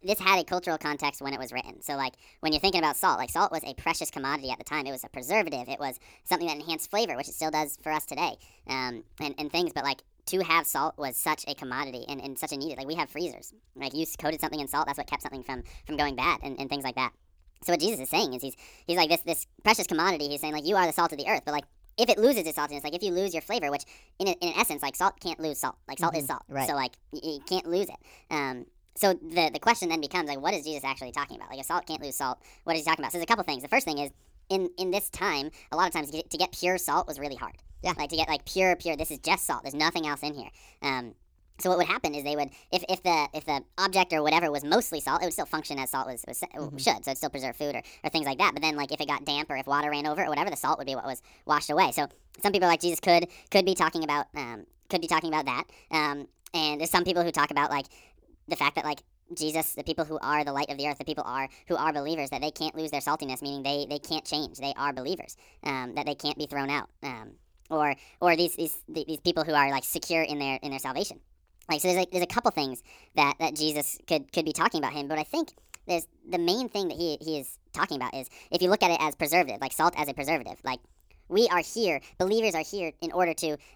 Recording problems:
wrong speed and pitch; too fast and too high; 1.5 times normal speed

